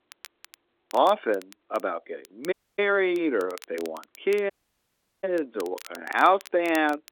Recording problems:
phone-call audio
crackle, like an old record; faint; 20 dB below the speech
audio cutting out; at 2.5 s and at 4.5 s for 0.5 s

